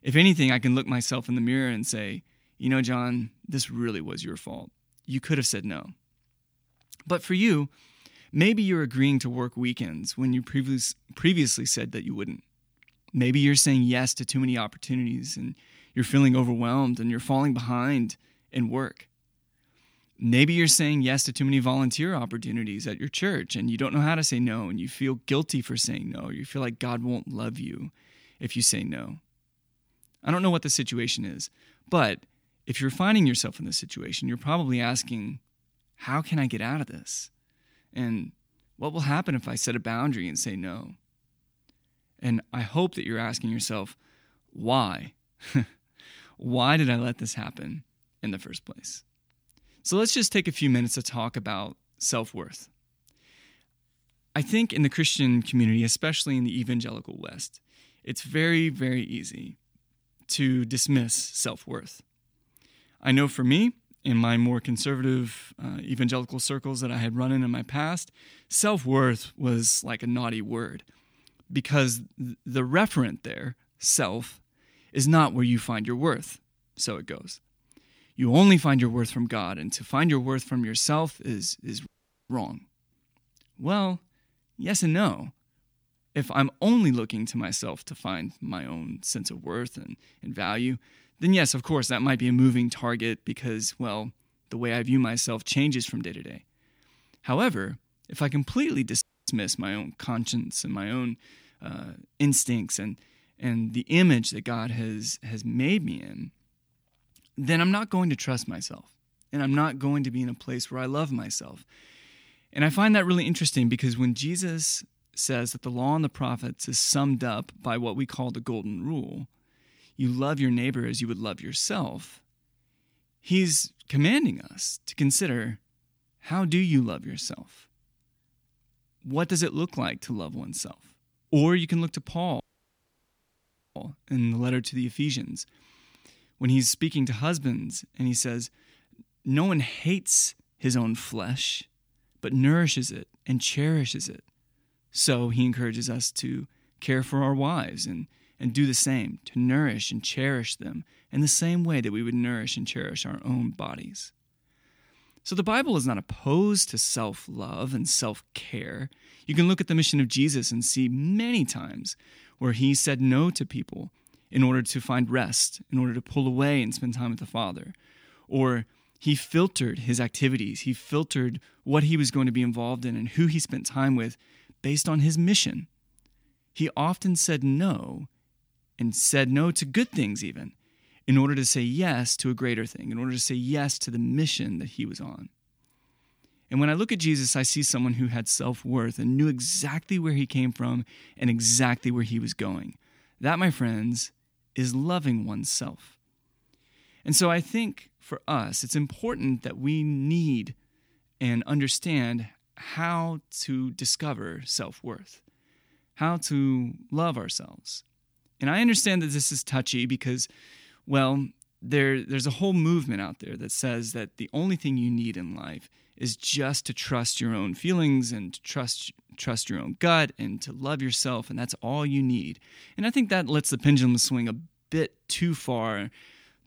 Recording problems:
audio cutting out; at 1:22, at 1:39 and at 2:12 for 1.5 s

